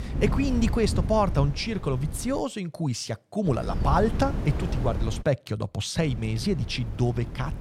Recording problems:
wind noise on the microphone; occasional gusts; until 2.5 s, from 3.5 to 5 s and from 6 s on; 10 dB below the speech

